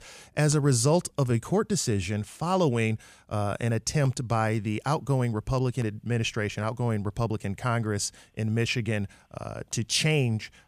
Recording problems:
none

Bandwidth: 14.5 kHz